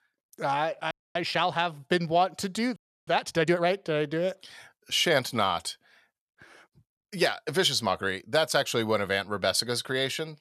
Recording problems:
audio freezing; at 1 s and at 3 s

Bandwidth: 13.5 kHz